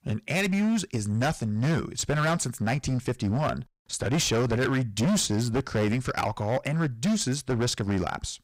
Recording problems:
distortion; heavy; 17% of the sound clipped

